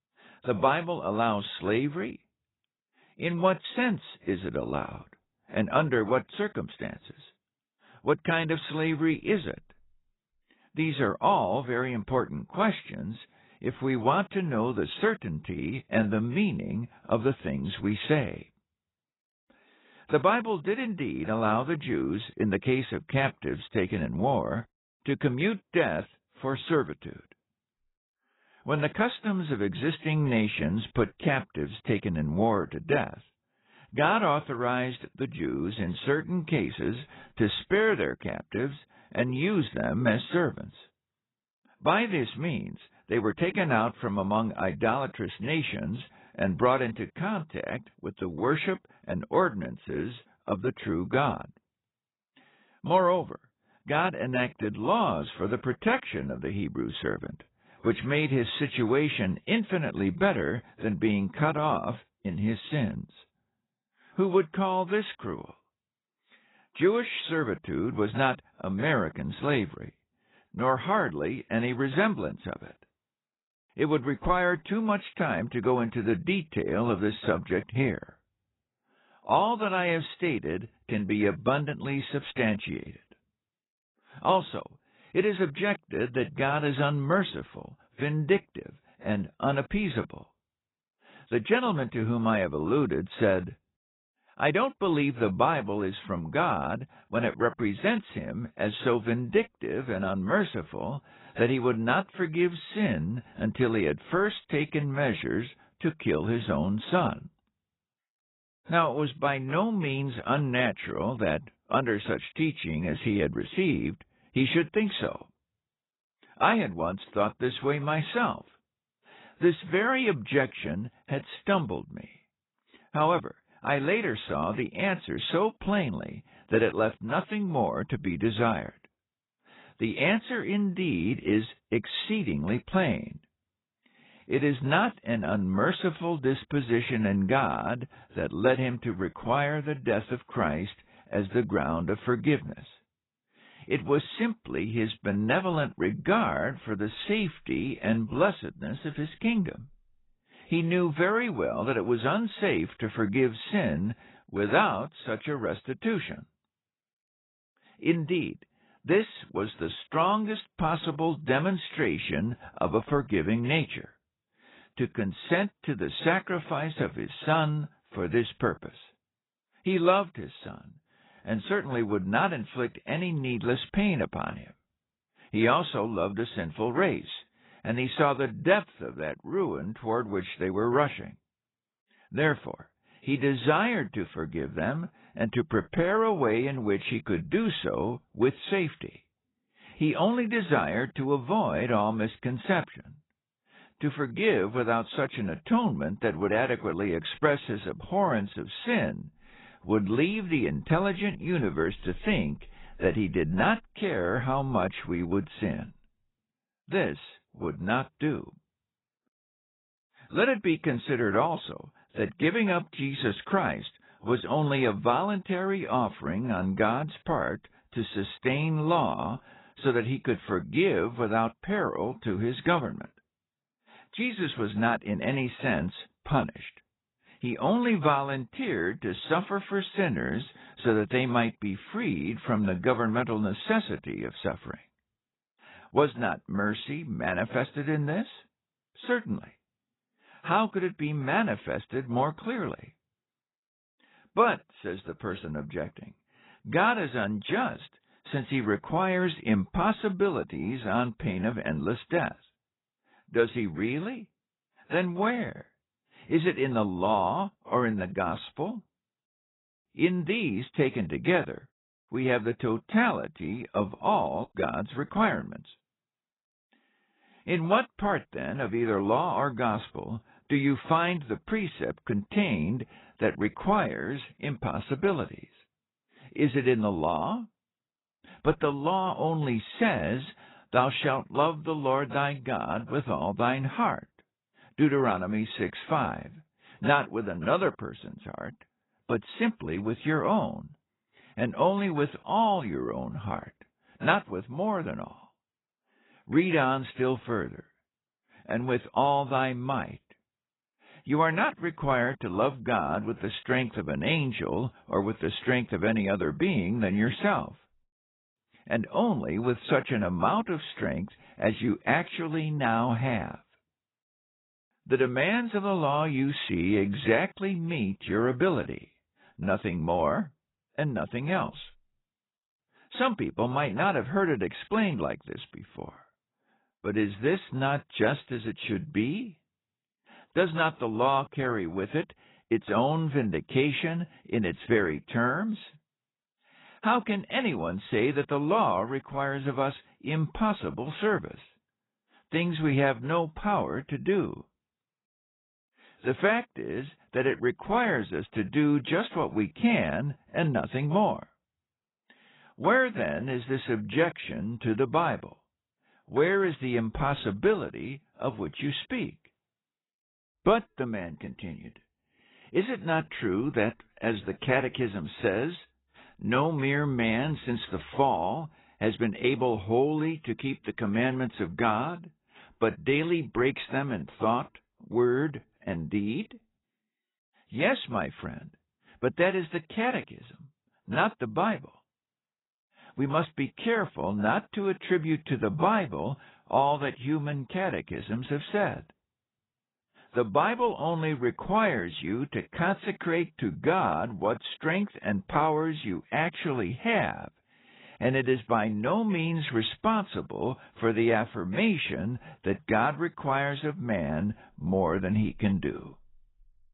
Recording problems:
garbled, watery; badly; nothing above 4 kHz

